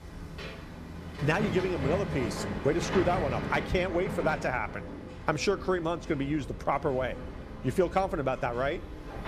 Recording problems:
machinery noise; loud; throughout; 7 dB below the speech

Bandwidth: 15 kHz